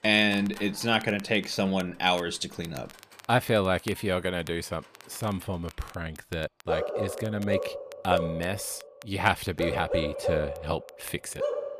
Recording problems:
animal sounds; loud; throughout; 4 dB below the speech
crackle, like an old record; faint; 20 dB below the speech

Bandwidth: 14.5 kHz